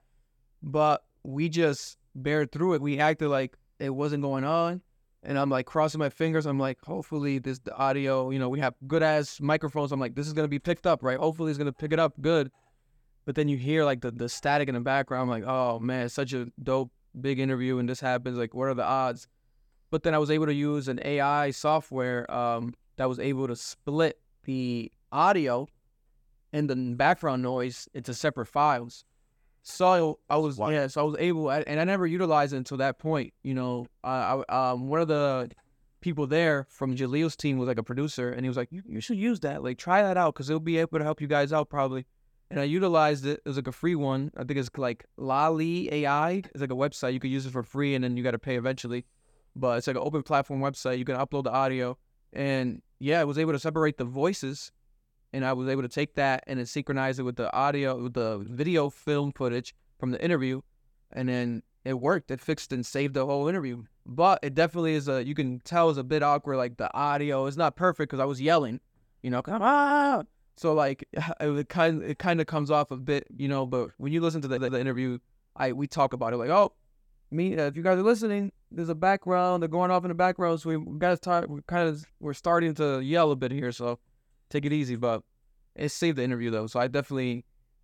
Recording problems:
audio stuttering; at 1:14

